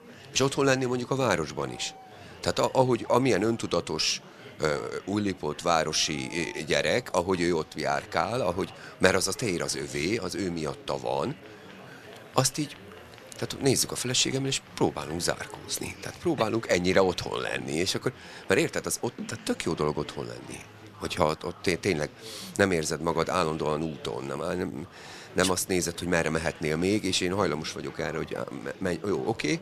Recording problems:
murmuring crowd; noticeable; throughout; 20 dB below the speech

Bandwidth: 13.5 kHz